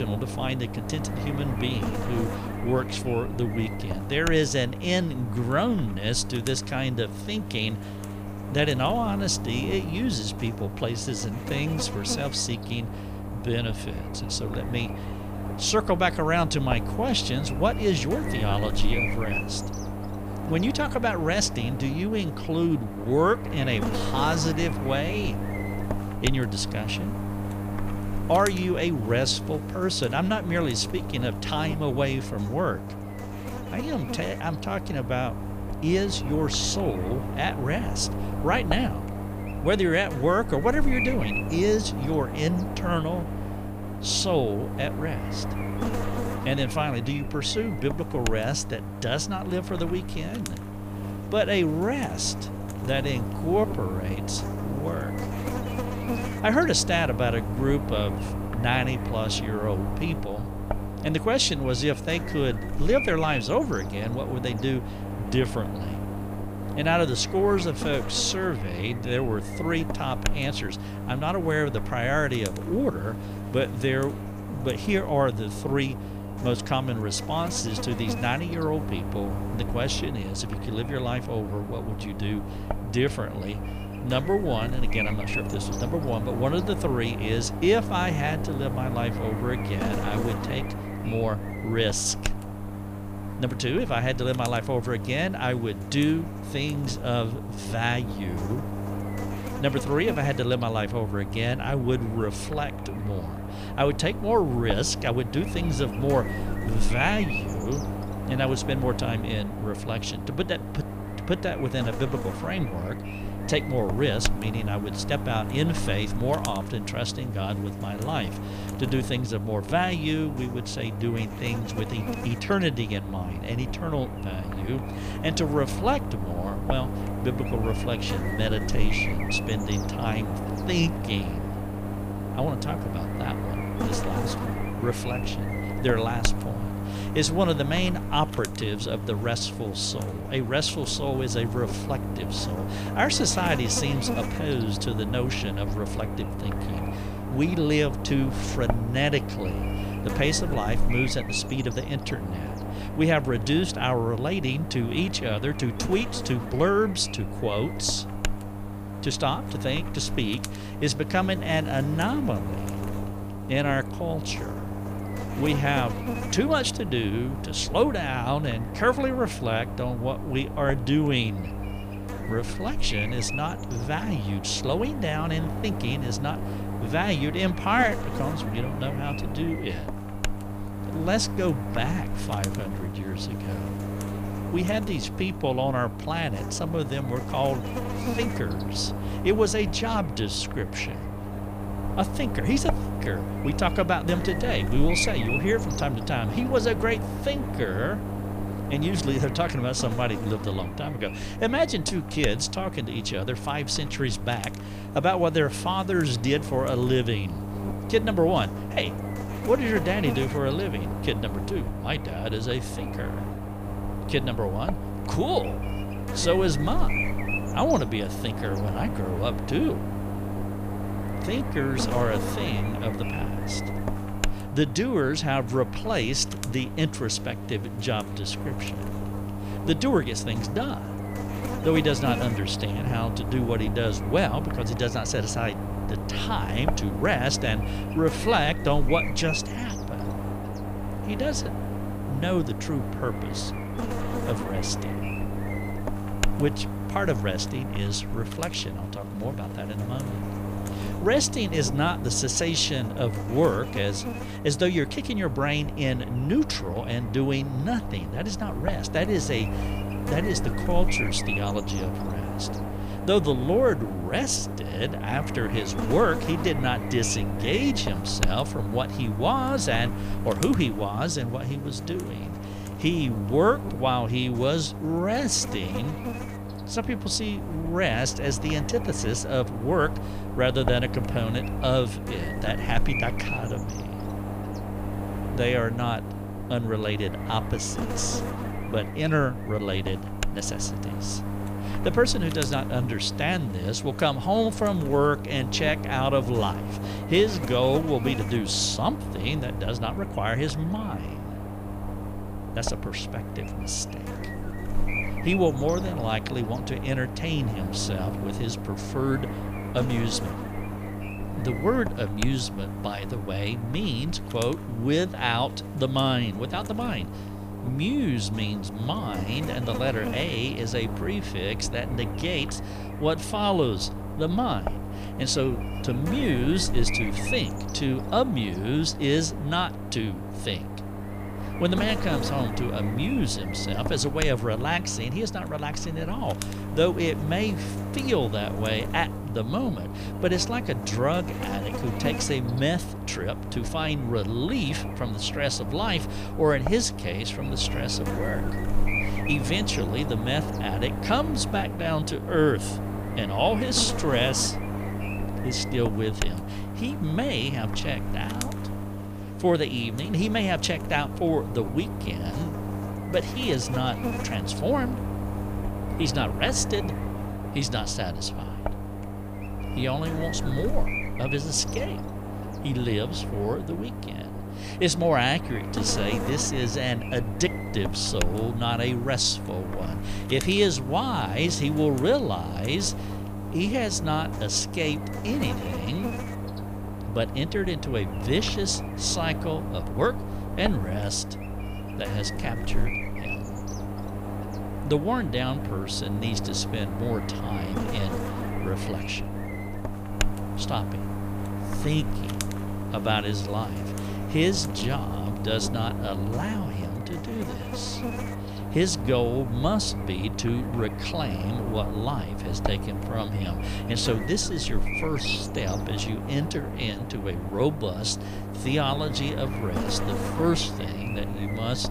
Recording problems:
electrical hum; loud; throughout; 50 Hz, 8 dB below the speech
abrupt cut into speech; at the start

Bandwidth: 15 kHz